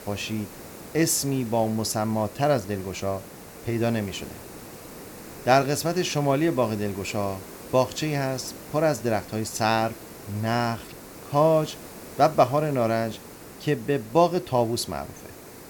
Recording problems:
hiss; noticeable; throughout; 15 dB below the speech

